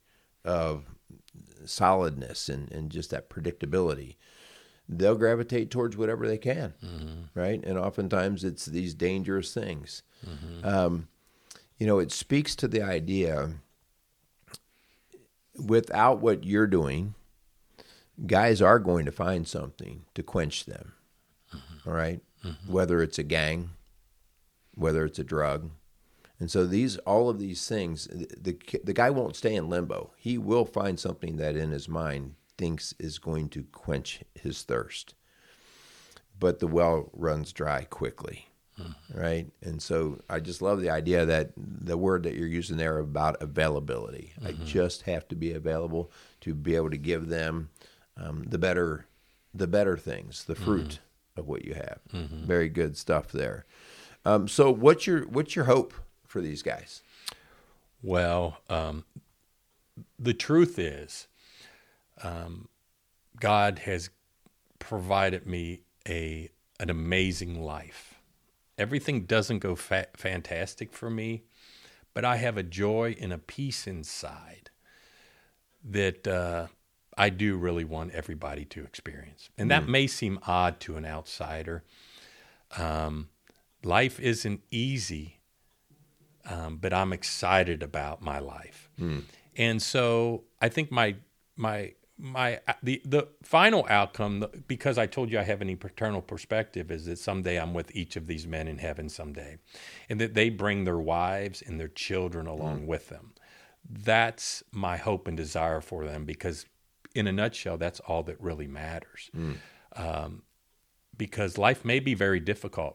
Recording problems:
none

